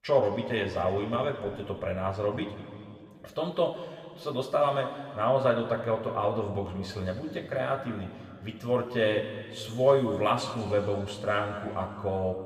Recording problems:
room echo; noticeable; dies away in 2.2 s
off-mic speech; somewhat distant

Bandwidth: 15.5 kHz